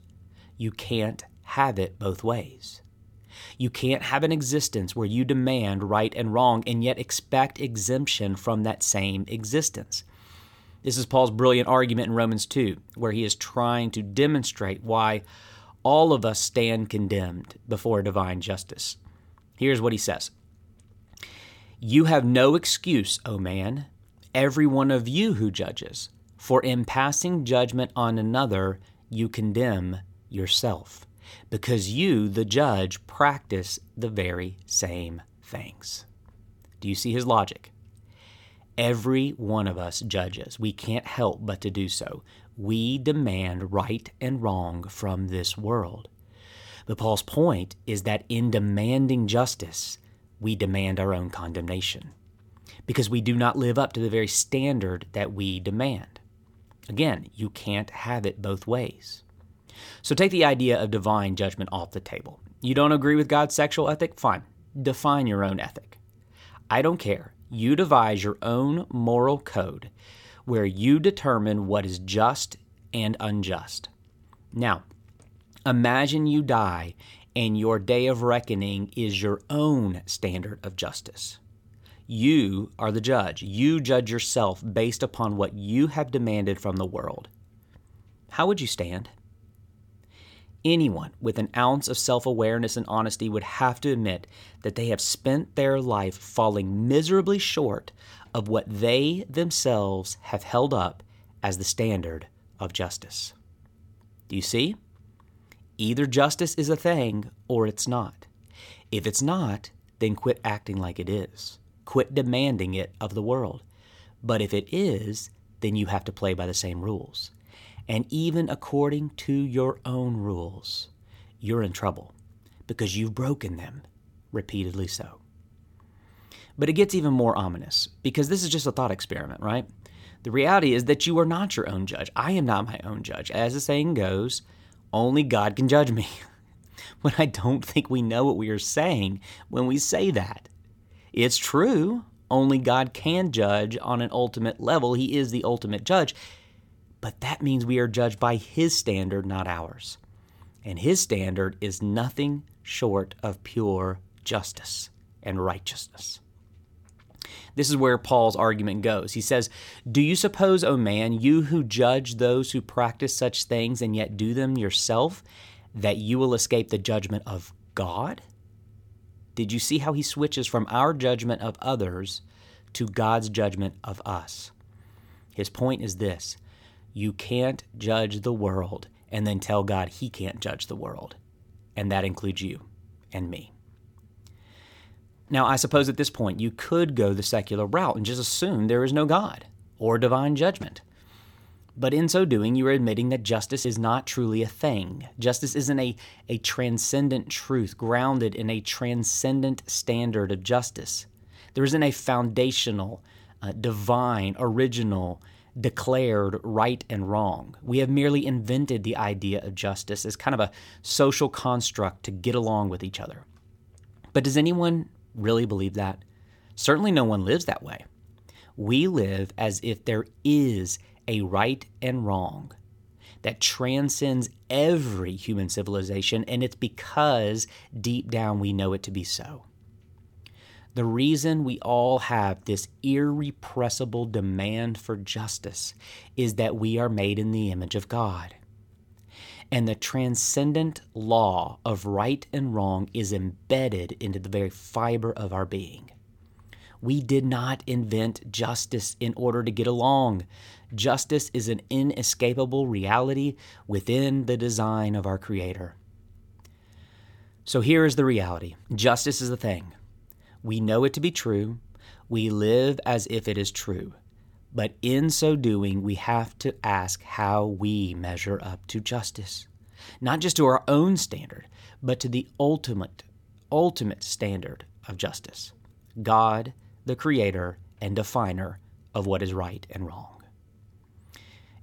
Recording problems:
none

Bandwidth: 17.5 kHz